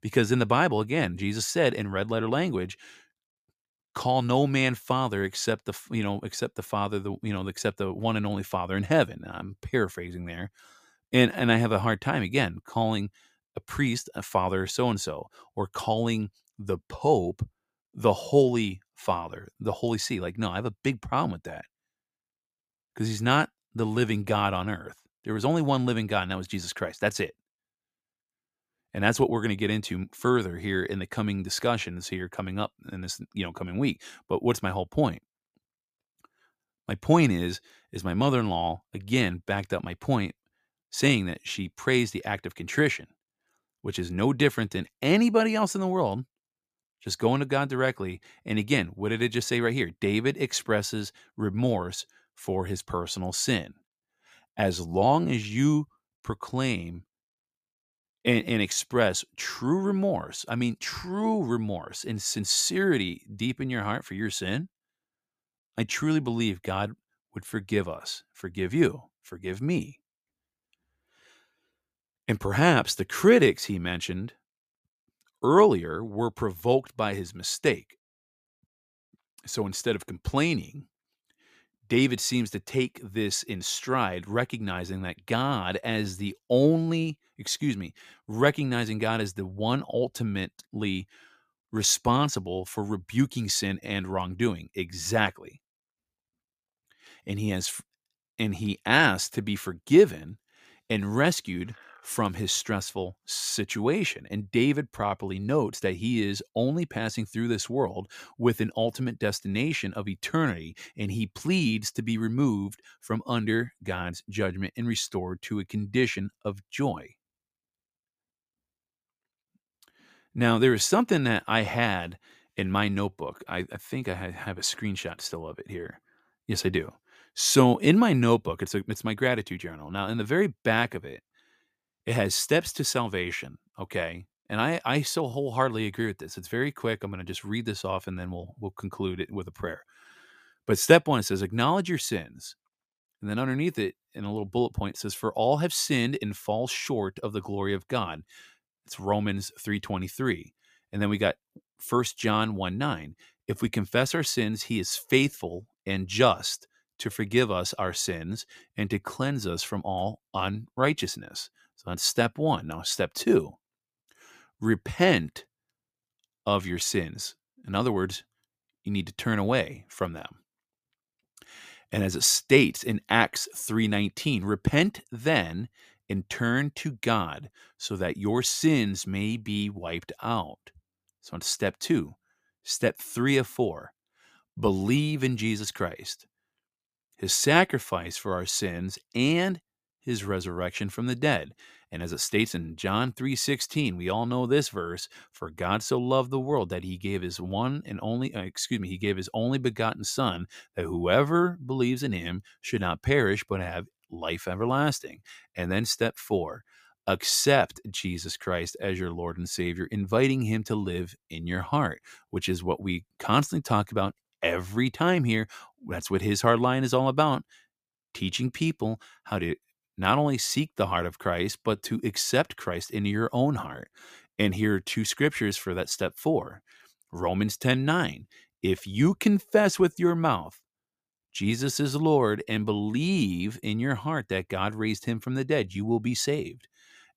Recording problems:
none

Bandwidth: 15 kHz